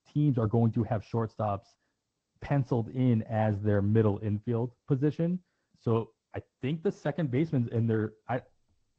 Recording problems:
muffled; very; fading above 2 kHz
garbled, watery; slightly; nothing above 16 kHz

